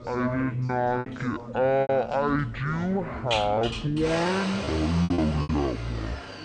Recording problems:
wrong speed and pitch; too slow and too low; 0.5 times normal speed
household noises; loud; throughout; 8 dB below the speech
background chatter; noticeable; throughout; 2 voices, 15 dB below the speech
choppy; very; 8% of the speech affected

